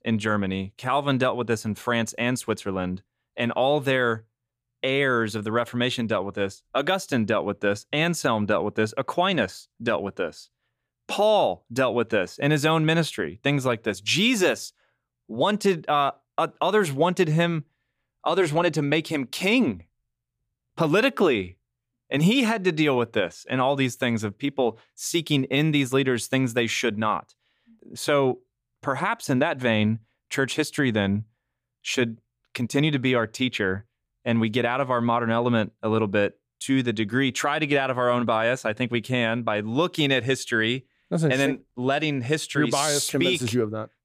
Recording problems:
none

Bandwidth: 15 kHz